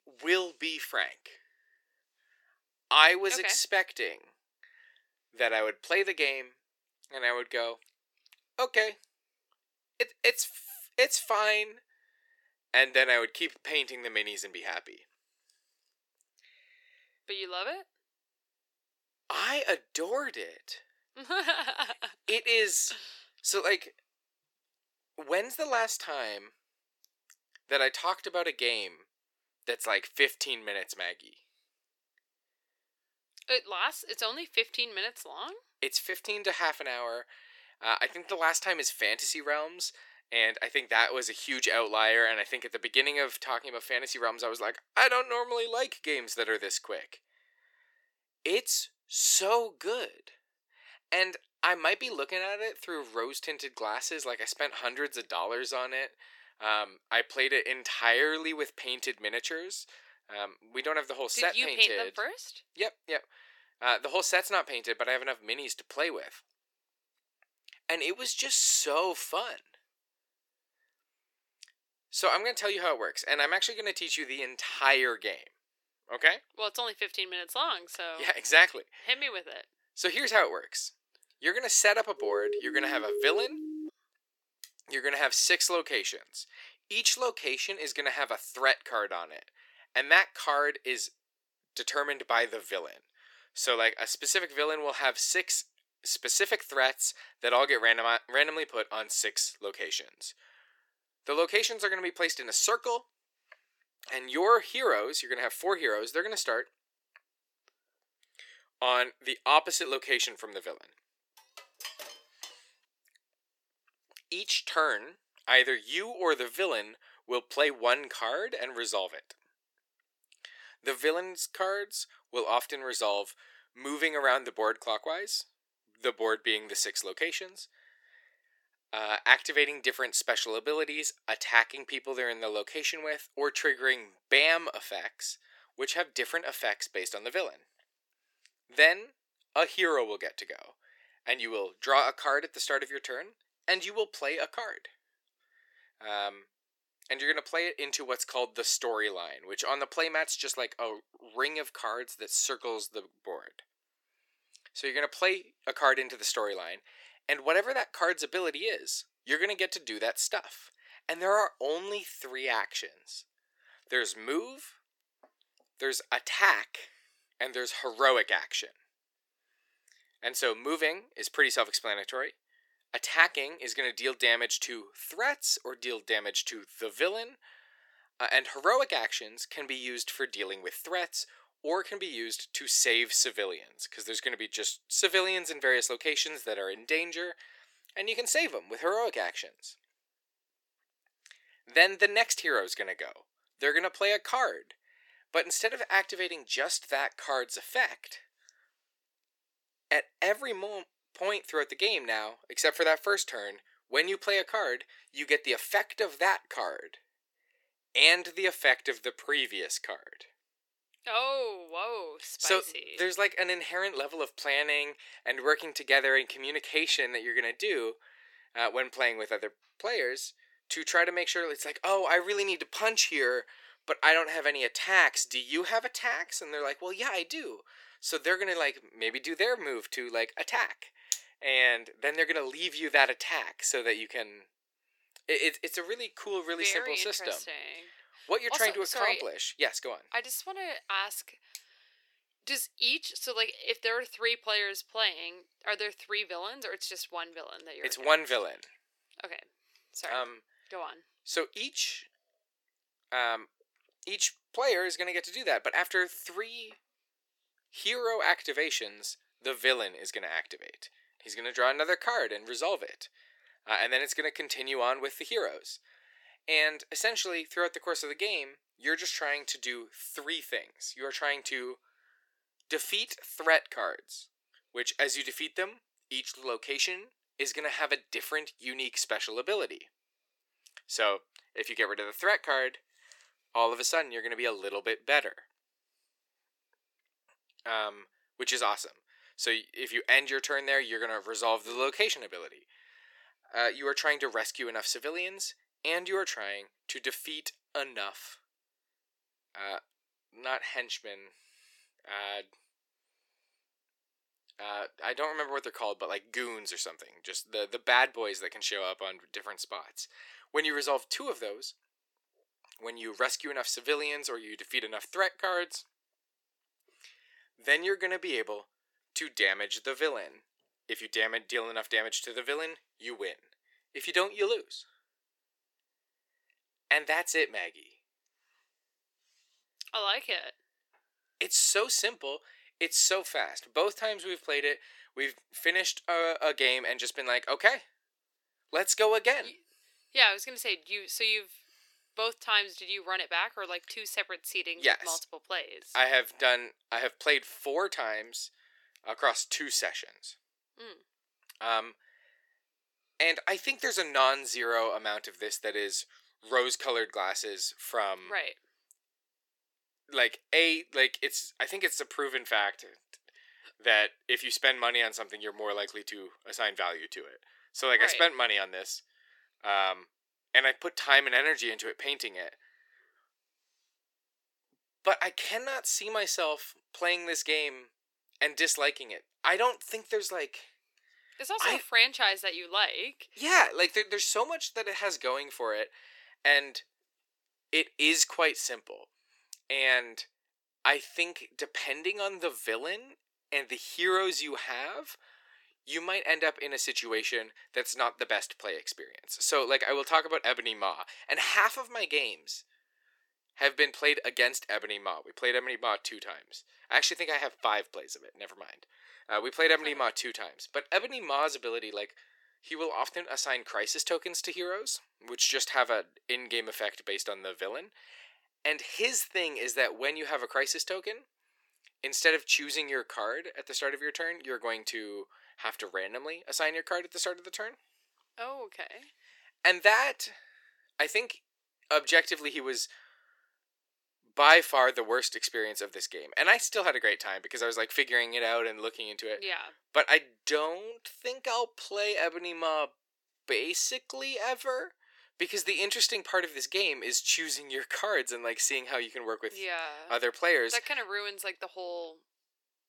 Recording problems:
thin; very; fading below 350 Hz
siren; noticeable; from 1:22 to 1:24; peak 3 dB below the speech
clattering dishes; faint; from 1:51 to 1:53; peak 10 dB below the speech

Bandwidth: 17.5 kHz